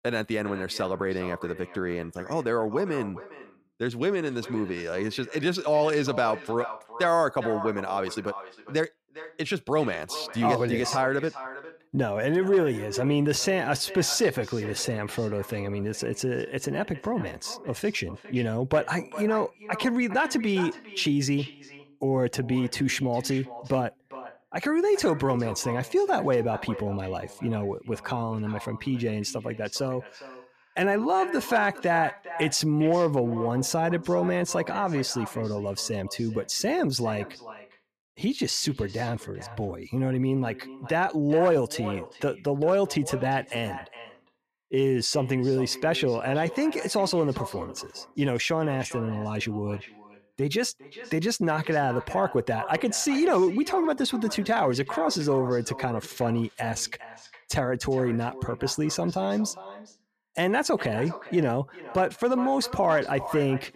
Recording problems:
echo of what is said; noticeable; throughout; 410 ms later, 15 dB below the speech

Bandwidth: 14.5 kHz